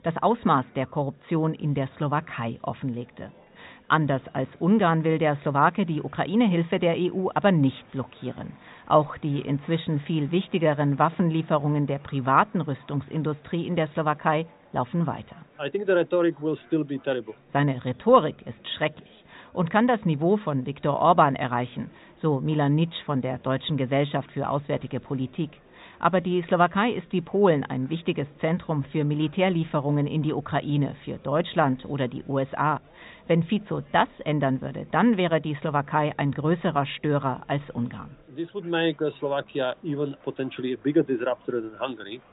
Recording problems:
high frequencies cut off; severe; nothing above 4 kHz
murmuring crowd; faint; throughout; 30 dB below the speech

